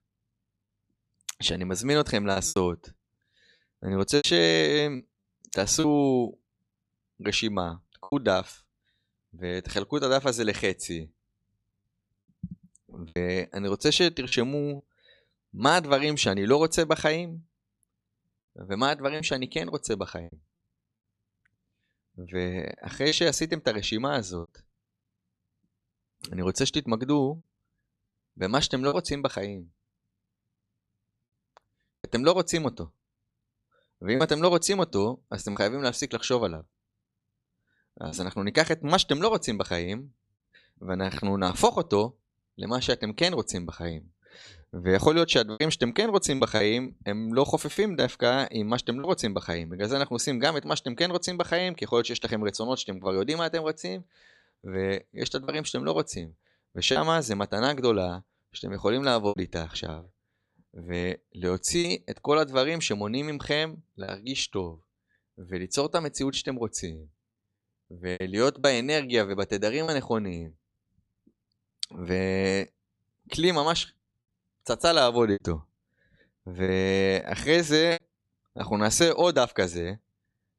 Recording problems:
choppy; occasionally; 4% of the speech affected

